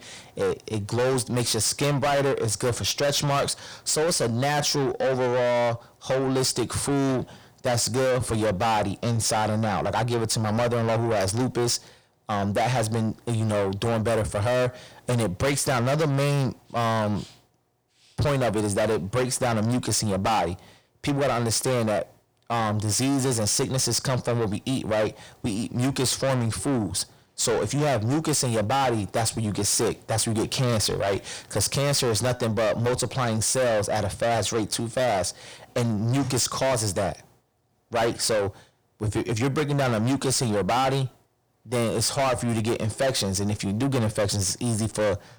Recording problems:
distortion; heavy; 6 dB below the speech

